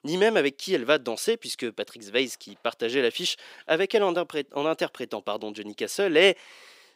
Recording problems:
thin; somewhat; fading below 450 Hz

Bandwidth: 15.5 kHz